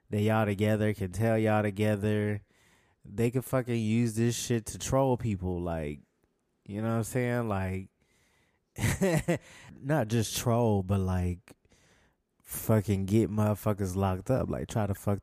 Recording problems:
none

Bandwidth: 14.5 kHz